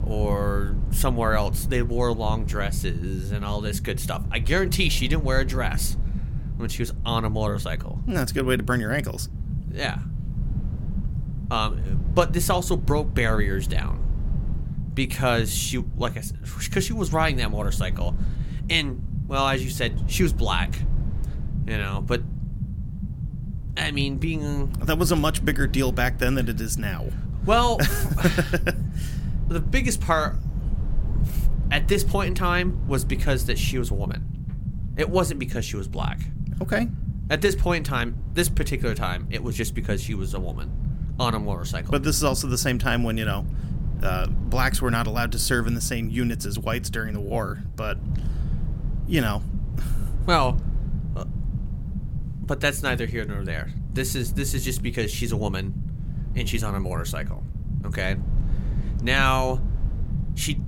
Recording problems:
low rumble; noticeable; throughout; 15 dB below the speech

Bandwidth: 16.5 kHz